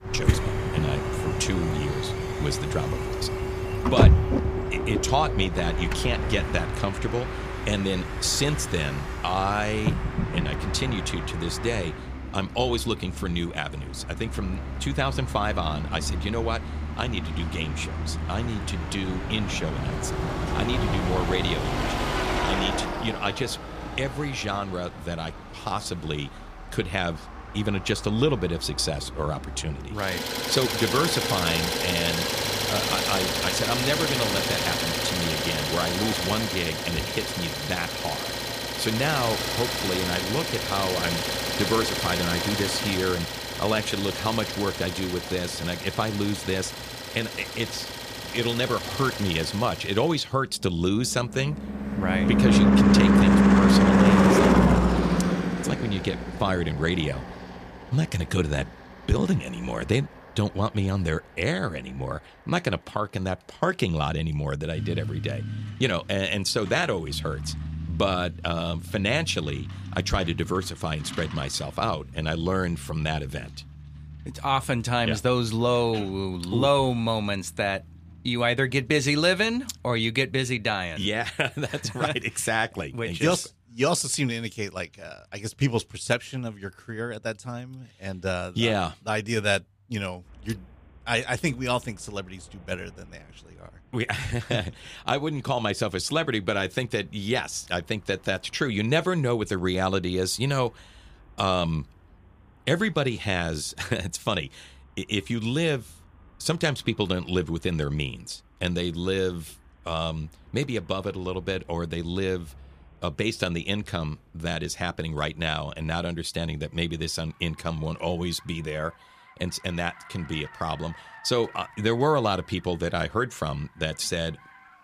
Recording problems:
traffic noise; very loud; throughout; 1 dB above the speech

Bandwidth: 15 kHz